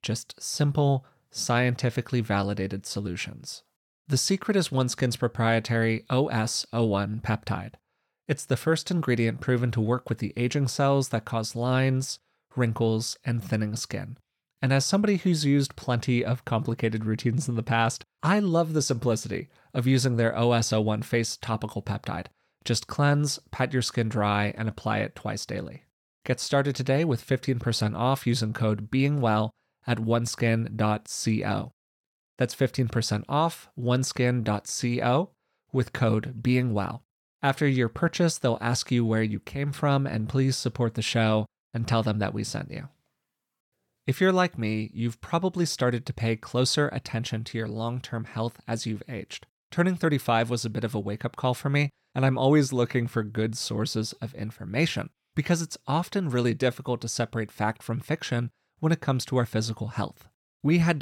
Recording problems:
abrupt cut into speech; at the end

